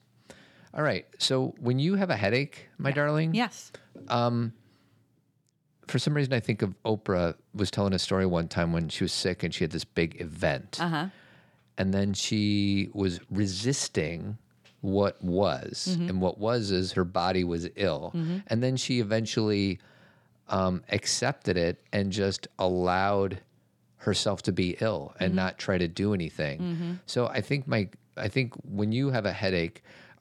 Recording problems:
none

